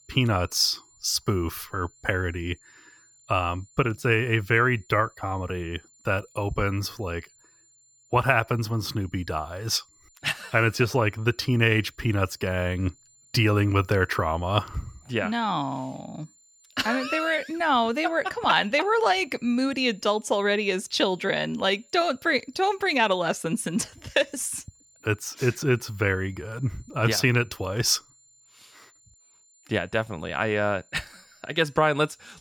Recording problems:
high-pitched whine; faint; throughout; 7 kHz, 30 dB below the speech

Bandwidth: 18.5 kHz